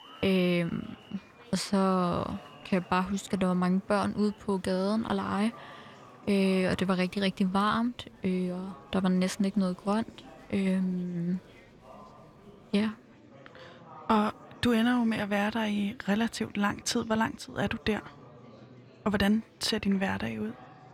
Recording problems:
murmuring crowd; faint; throughout; 20 dB below the speech

